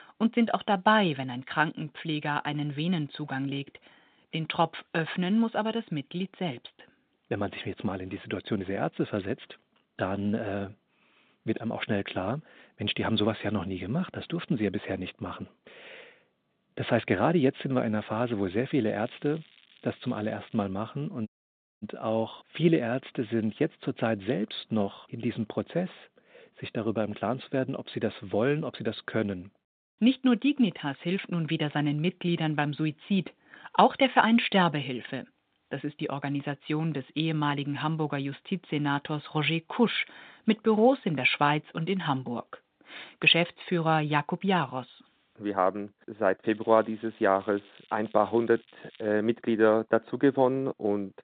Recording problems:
phone-call audio; nothing above 3.5 kHz
crackling; faint; from 19 to 21 s and from 46 to 49 s; 25 dB below the speech
audio cutting out; at 21 s for 0.5 s

